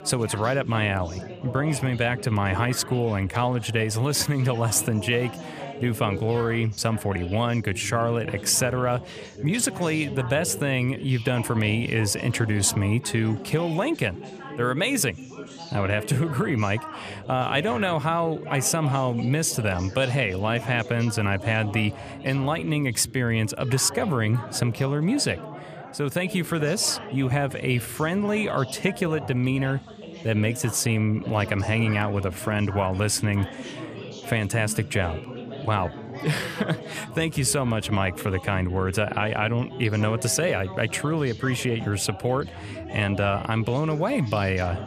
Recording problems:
background chatter; noticeable; throughout; 3 voices, 15 dB below the speech

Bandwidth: 15 kHz